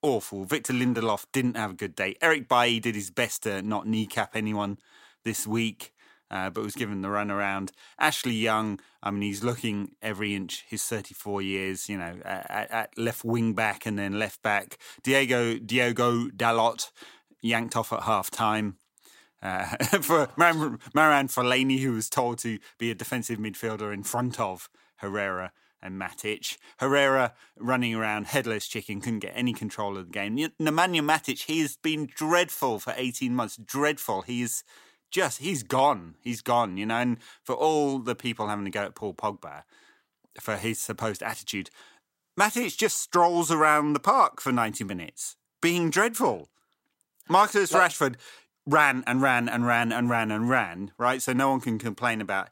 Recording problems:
none

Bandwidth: 16 kHz